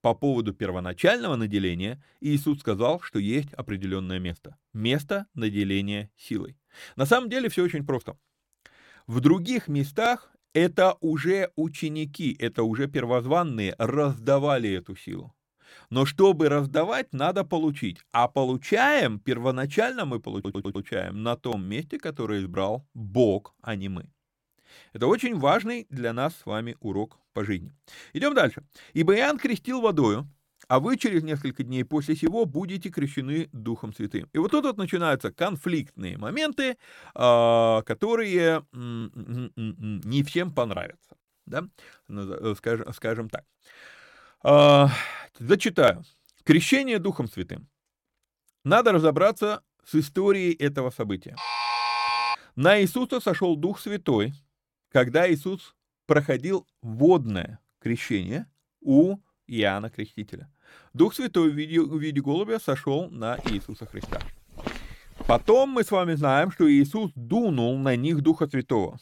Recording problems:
audio stuttering; at 20 s
alarm; loud; at 51 s; peak 1 dB above the speech
footsteps; faint; from 1:03 to 1:05; peak 10 dB below the speech

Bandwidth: 17 kHz